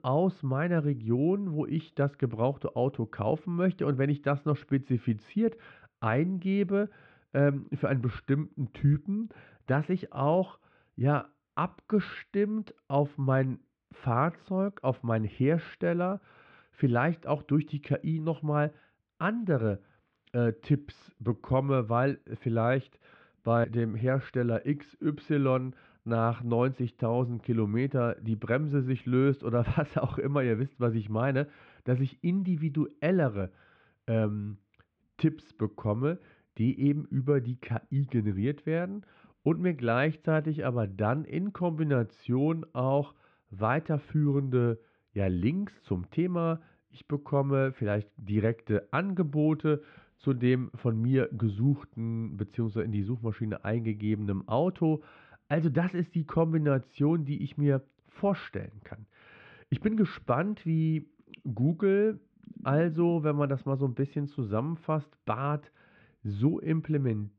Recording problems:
muffled; very; fading above 3 kHz

